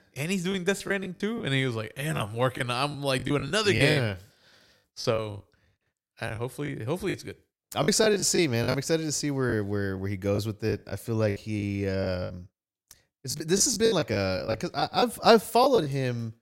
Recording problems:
choppy; very; 10% of the speech affected

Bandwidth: 16 kHz